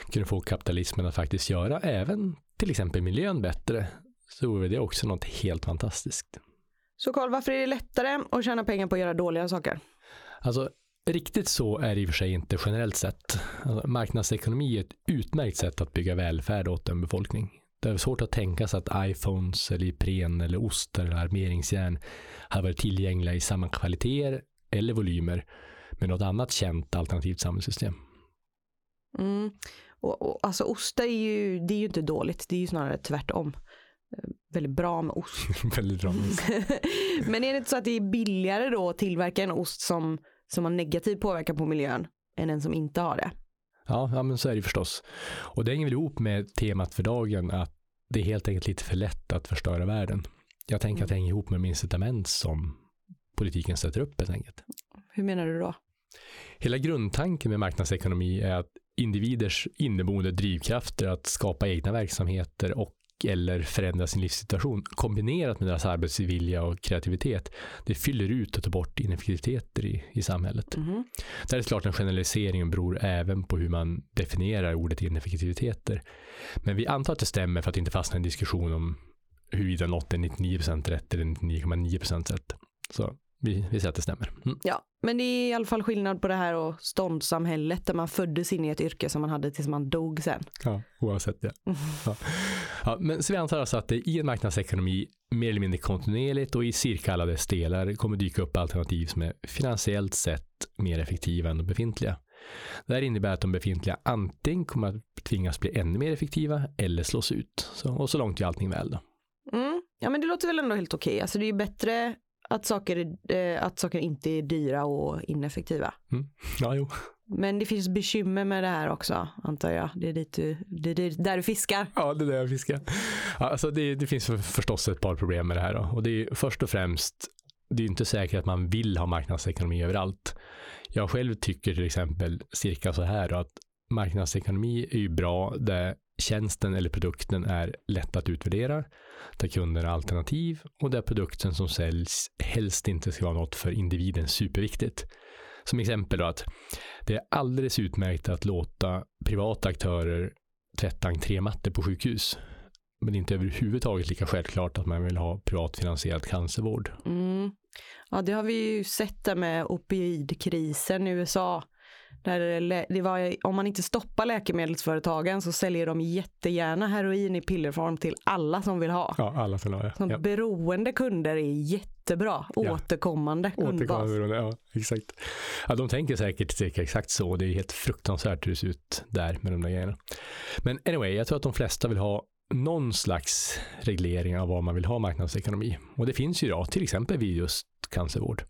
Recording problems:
squashed, flat; heavily

